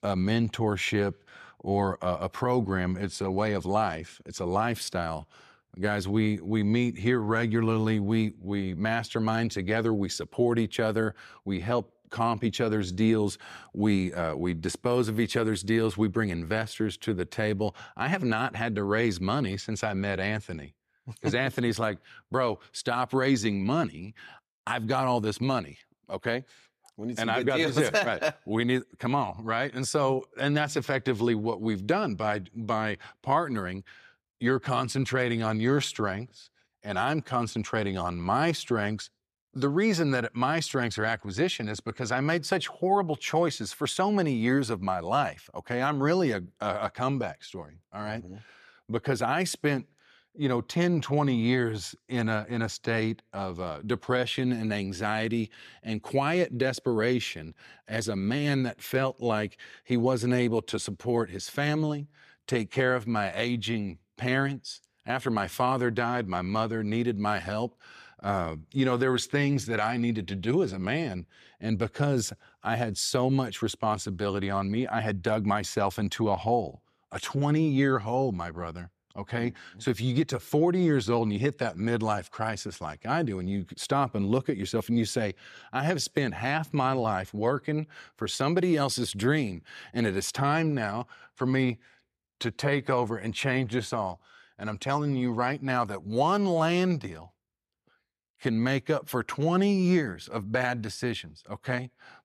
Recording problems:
none

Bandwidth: 14.5 kHz